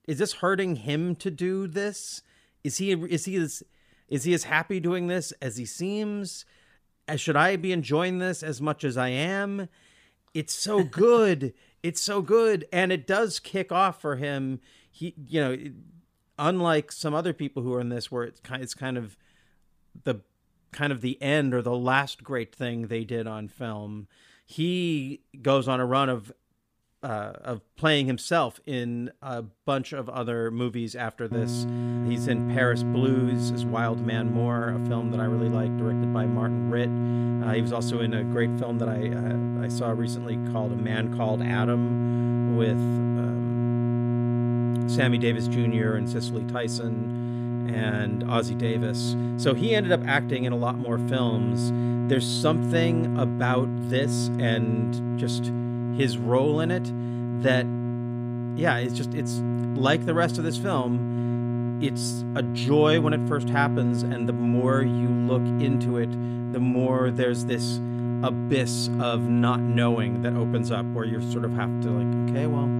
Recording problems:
electrical hum; loud; from 31 s on; 60 Hz, 6 dB below the speech

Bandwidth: 15 kHz